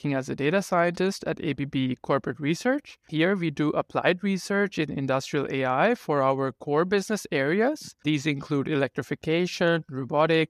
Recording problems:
none

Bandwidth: 14.5 kHz